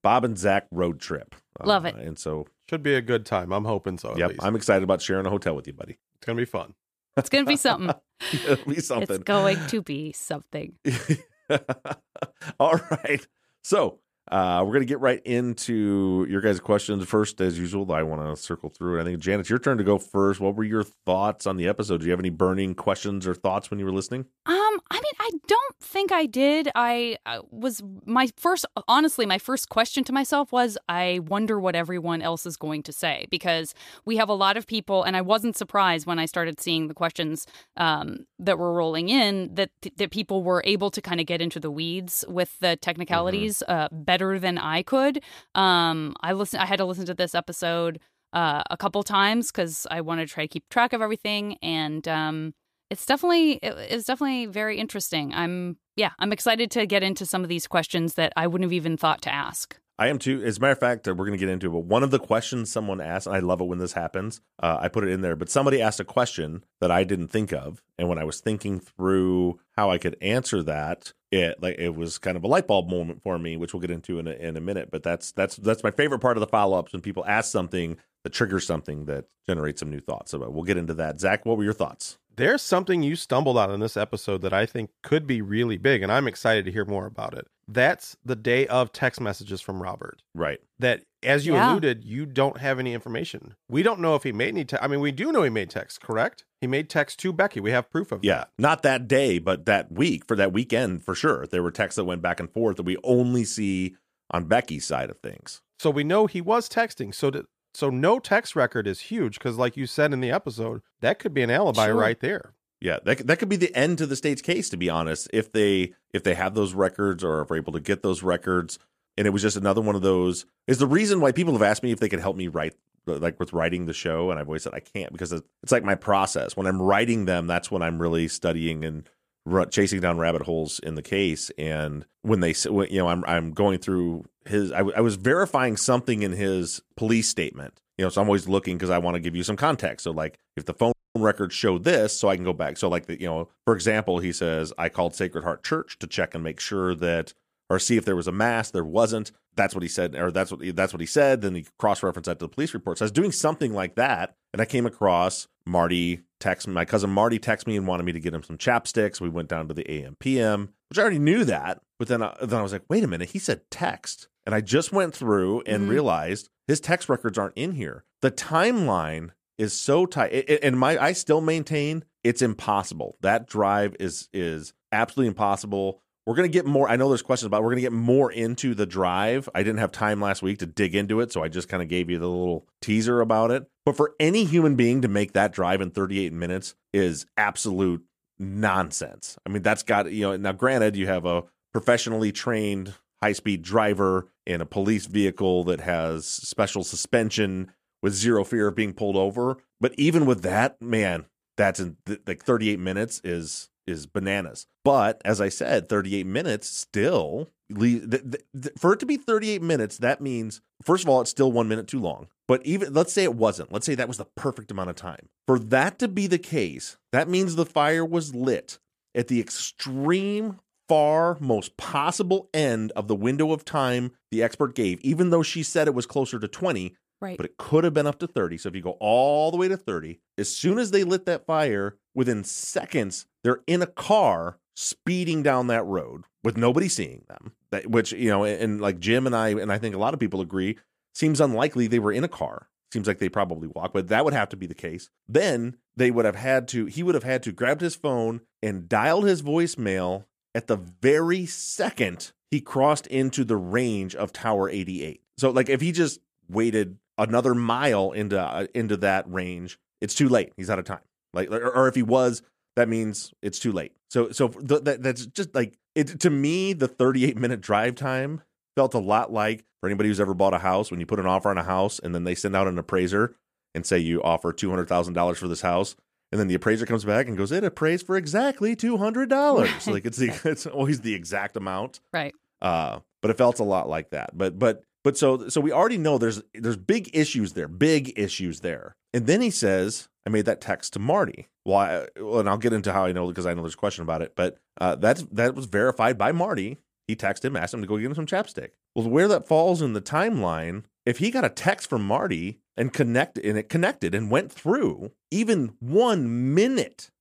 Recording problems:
audio cutting out; at 2:21

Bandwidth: 14.5 kHz